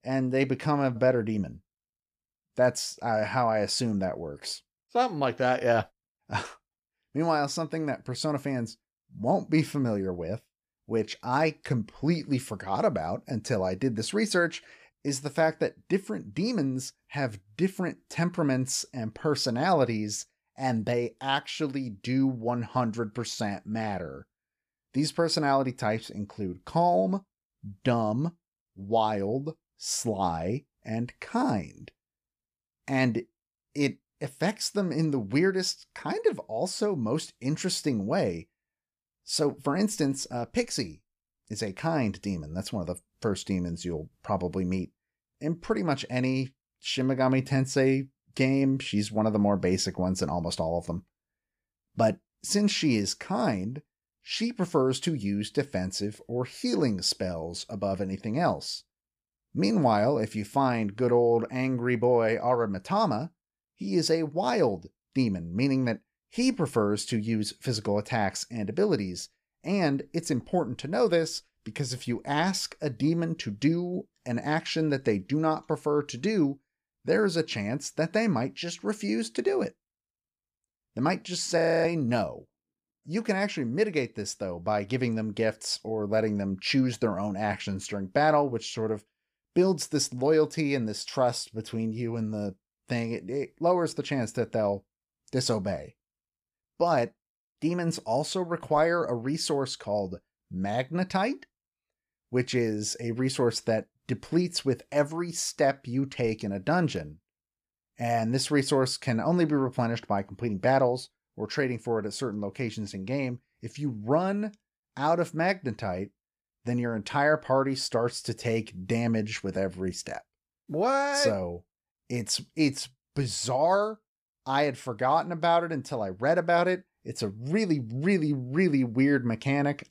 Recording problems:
audio freezing; at 1:22

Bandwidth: 14.5 kHz